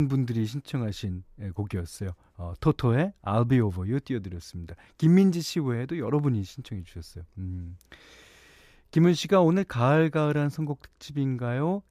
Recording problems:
abrupt cut into speech; at the start

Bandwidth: 14.5 kHz